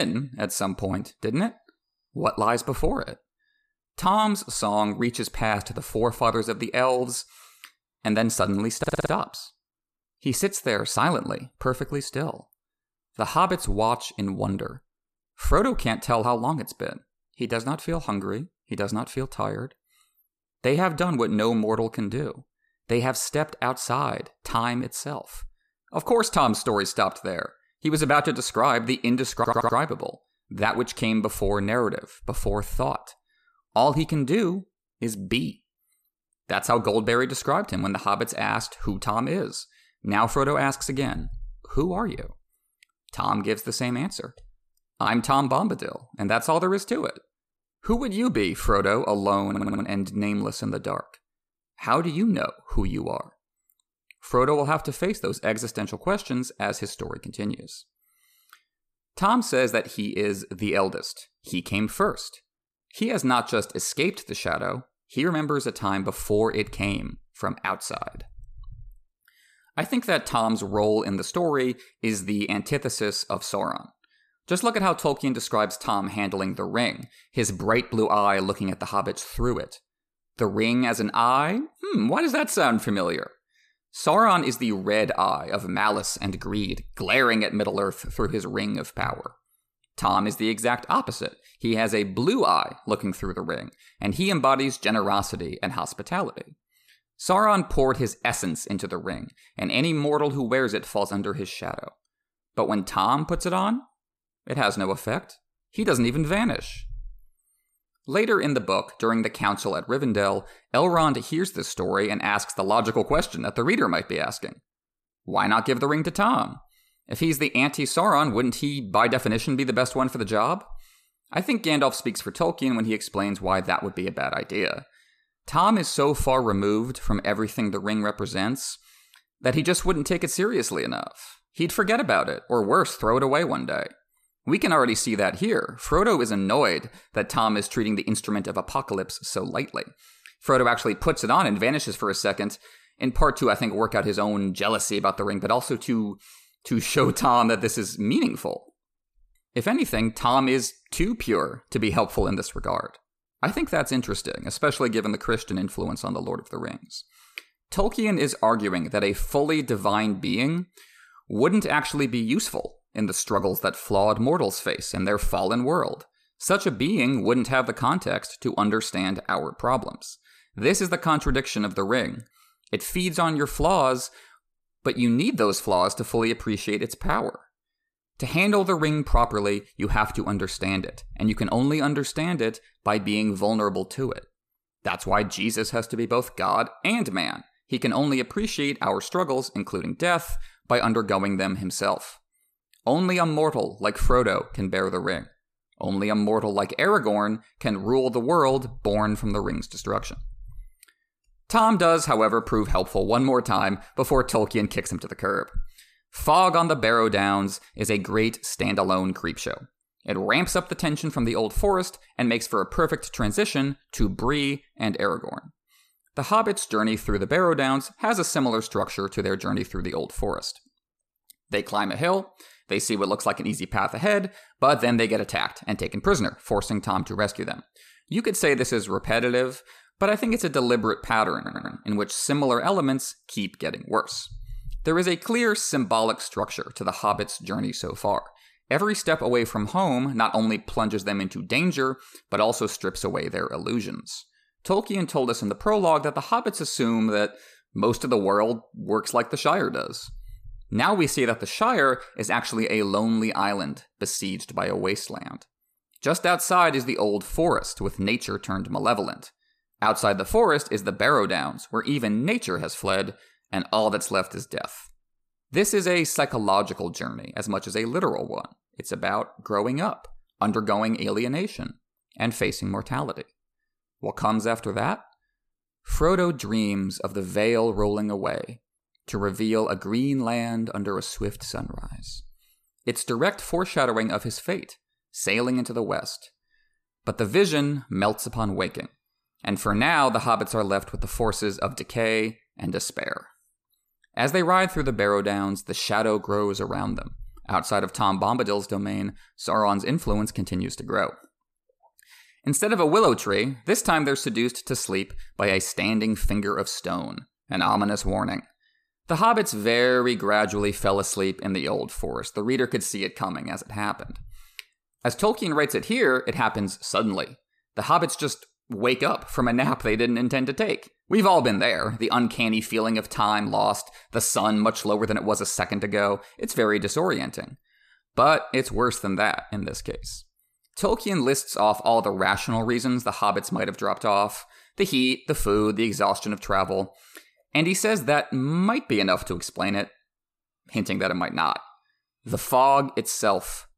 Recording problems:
abrupt cut into speech; at the start
audio stuttering; 4 times, first at 9 s

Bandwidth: 14.5 kHz